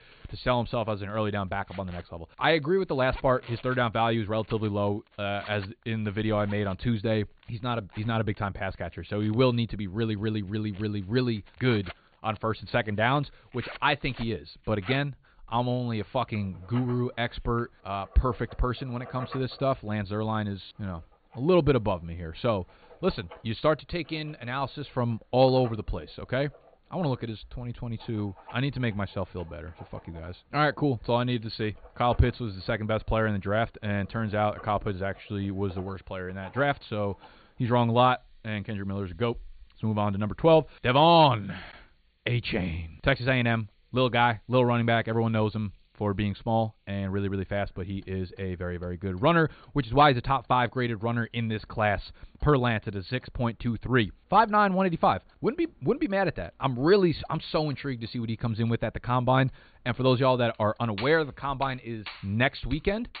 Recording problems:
high frequencies cut off; severe; nothing above 4.5 kHz
household noises; faint; throughout; 20 dB below the speech

